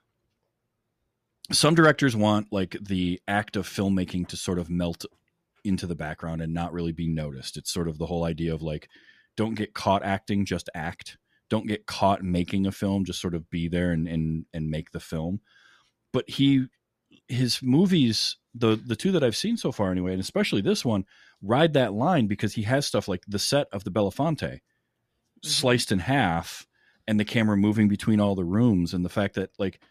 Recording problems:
none

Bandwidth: 14.5 kHz